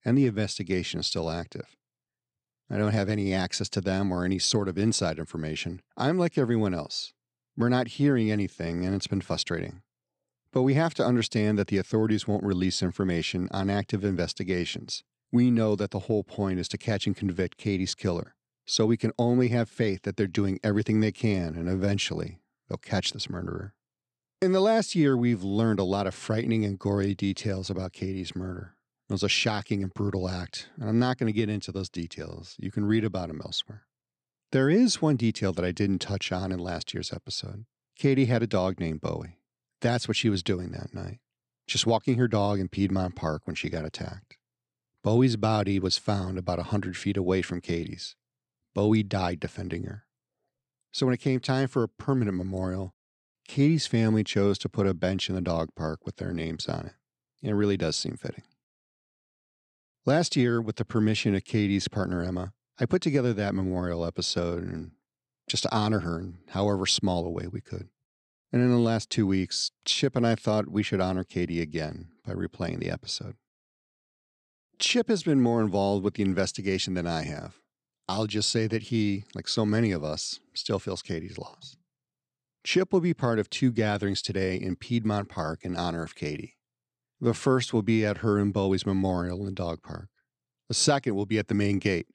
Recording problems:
none

